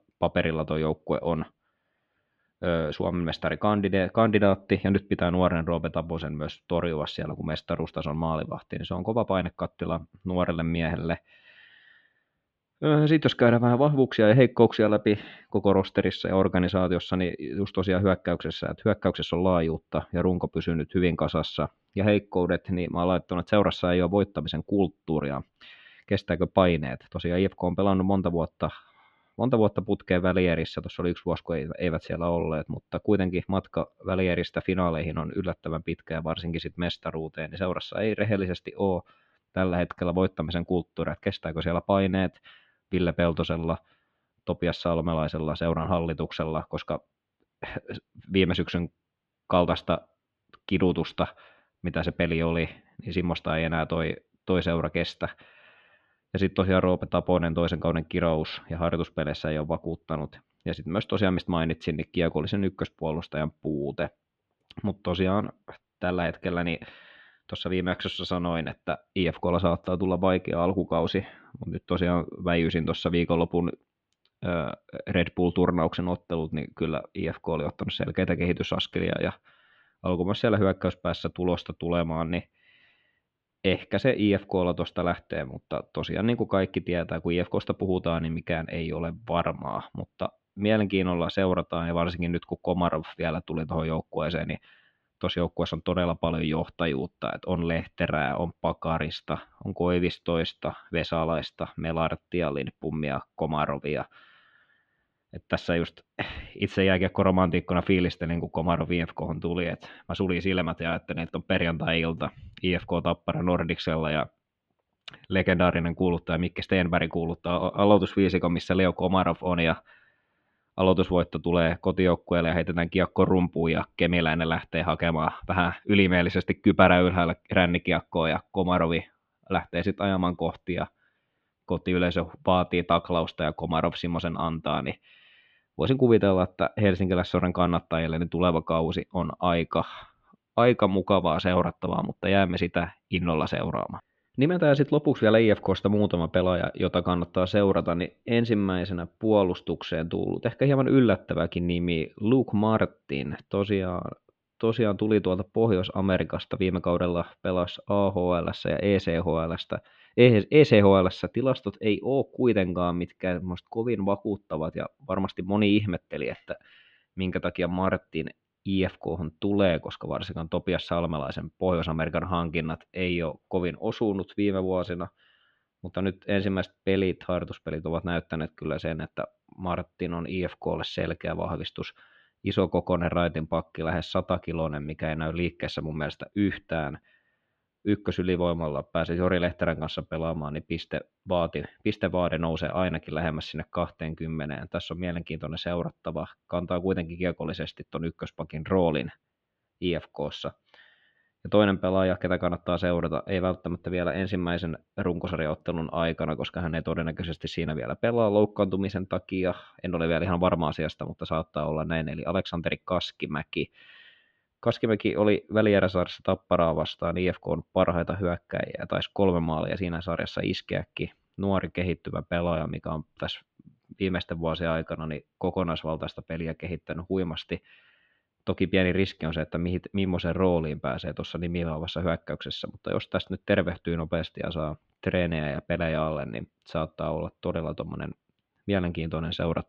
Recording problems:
muffled; slightly; fading above 3 kHz

